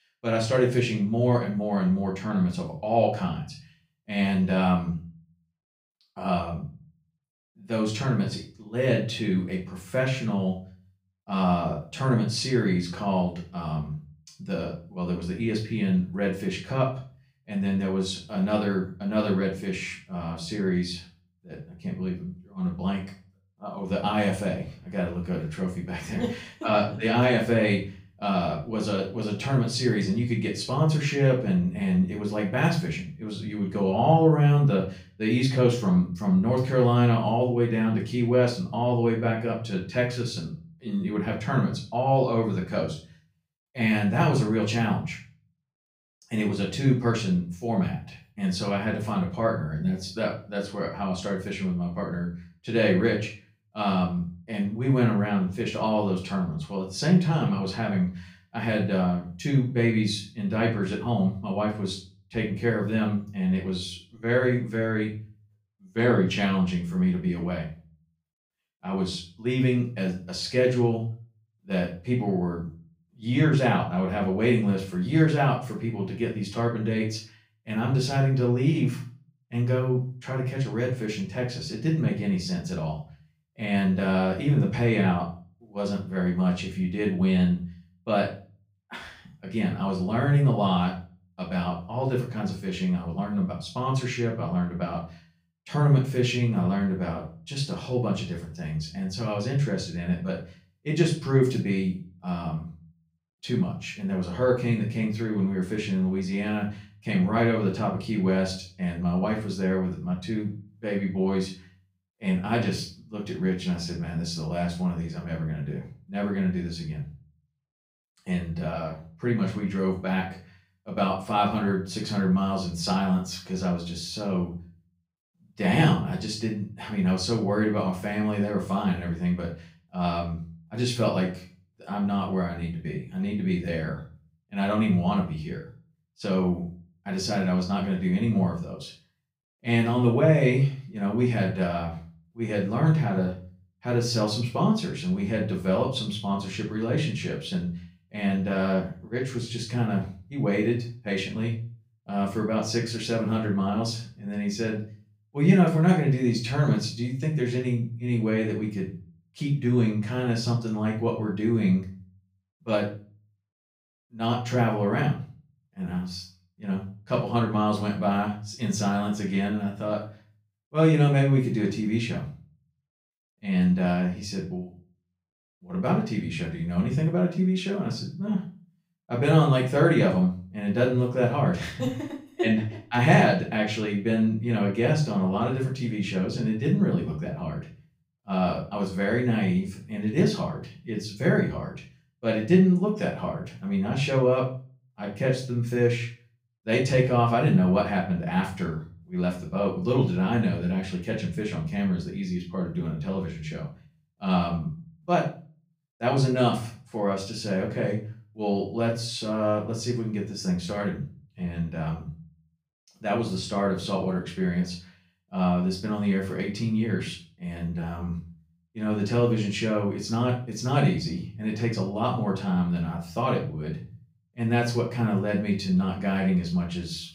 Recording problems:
off-mic speech; far
room echo; slight; dies away in 0.3 s

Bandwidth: 15.5 kHz